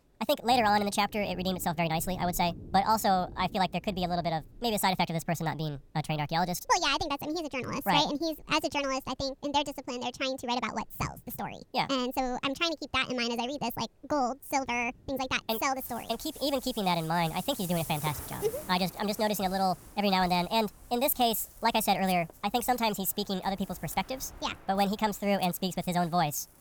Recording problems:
wrong speed and pitch; too fast and too high; 1.5 times normal speed
rain or running water; noticeable; throughout; 15 dB below the speech

